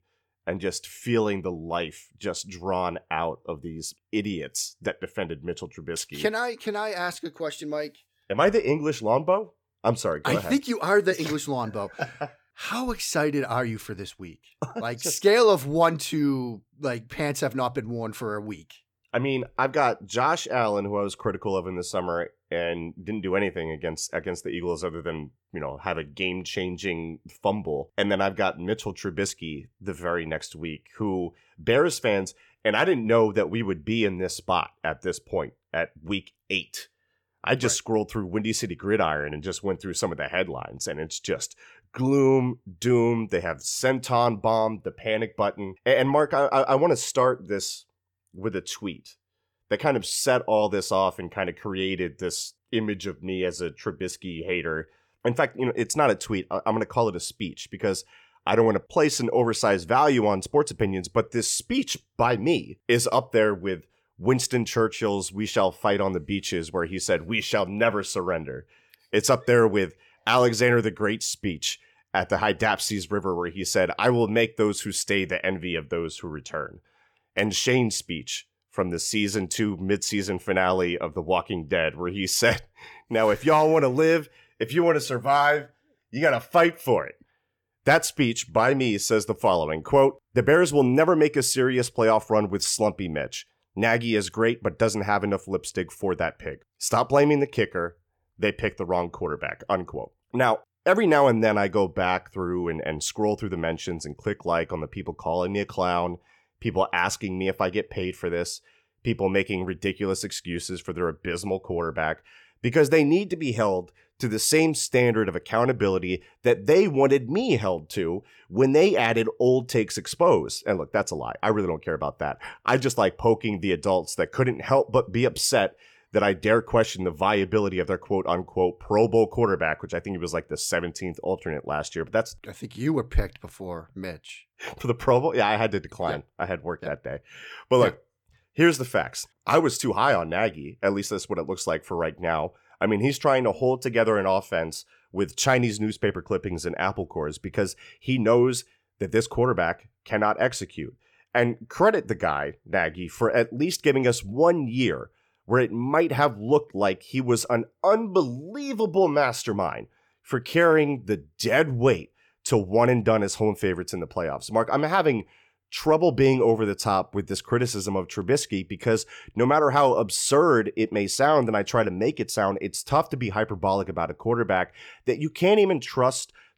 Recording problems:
none

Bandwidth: 18.5 kHz